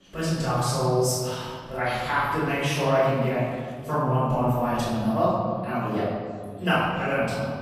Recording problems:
room echo; strong; dies away in 2 s
off-mic speech; far
chatter from many people; faint; throughout; 30 dB below the speech

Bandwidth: 14.5 kHz